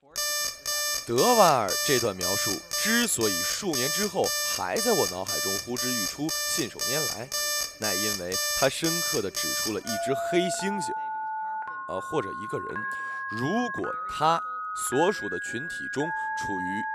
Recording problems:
alarms or sirens; very loud; throughout; 1 dB above the speech
voice in the background; faint; throughout; 30 dB below the speech

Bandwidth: 14.5 kHz